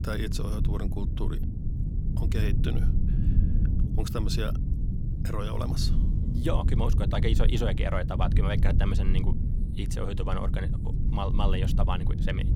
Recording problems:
low rumble; loud; throughout; 6 dB below the speech

